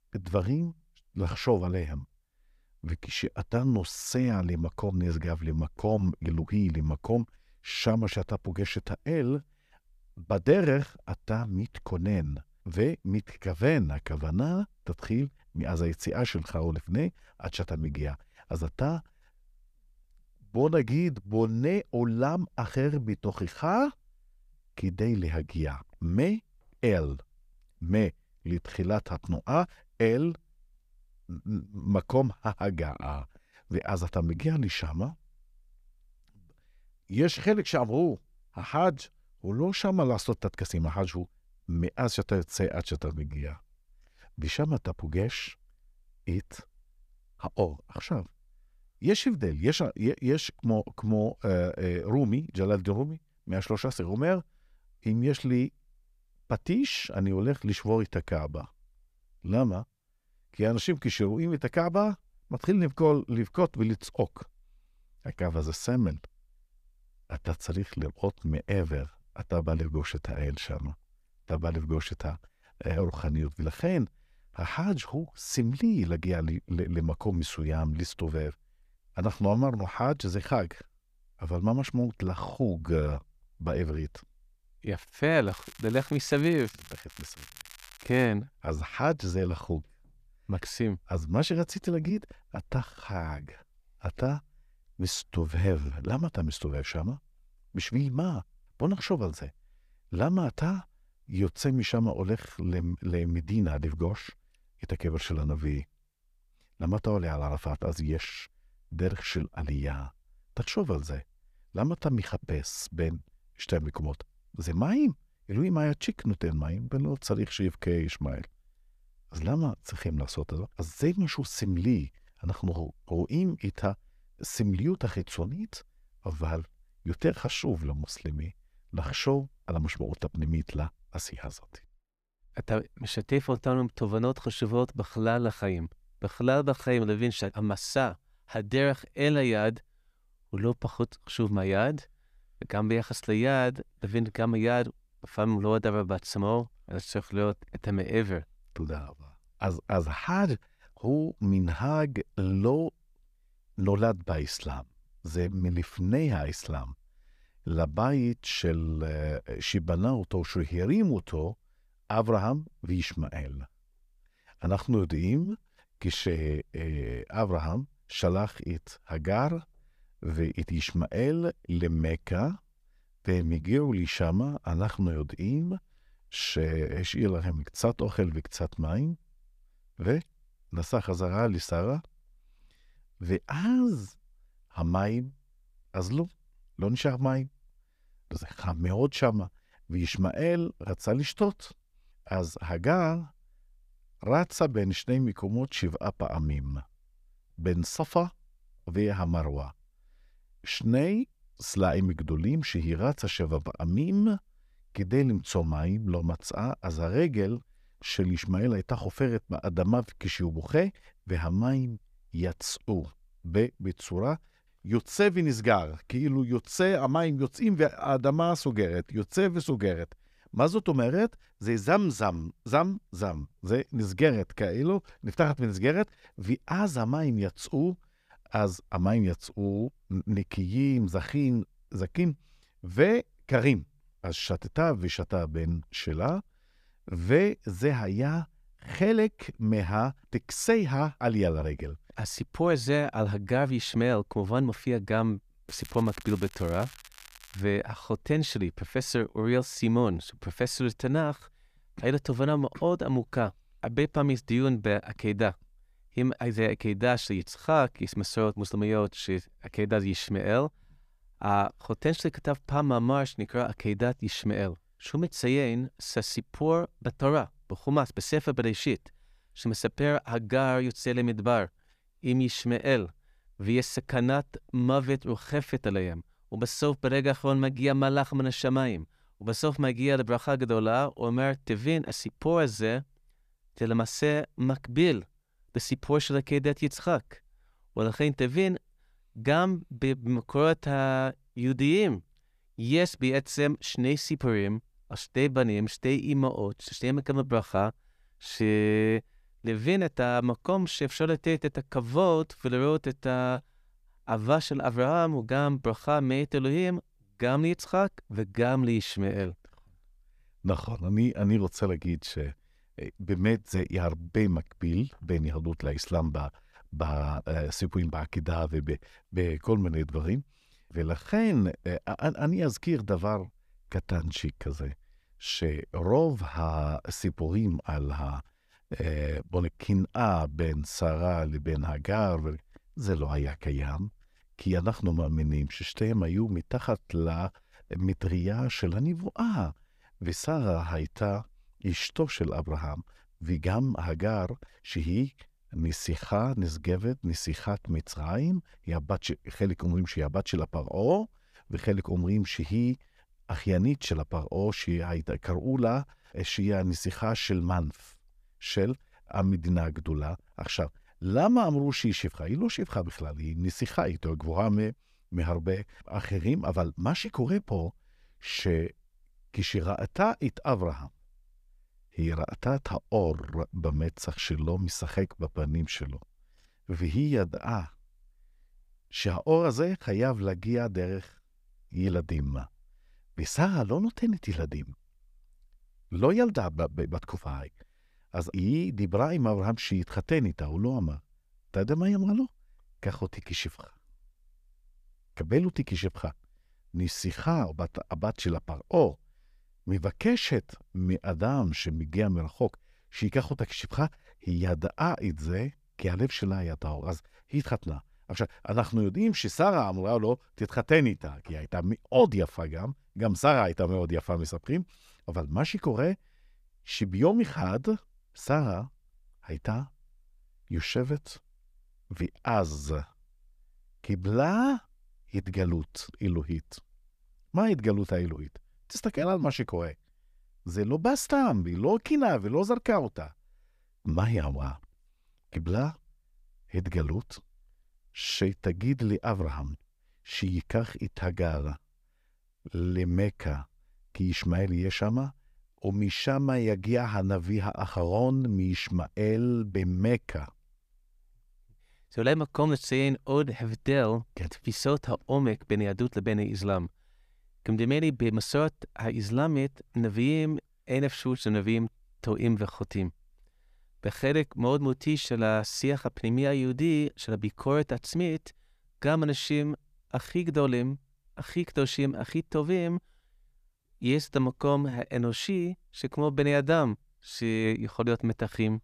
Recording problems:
crackling; noticeable; from 1:25 to 1:28 and from 4:06 to 4:08; 20 dB below the speech

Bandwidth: 14.5 kHz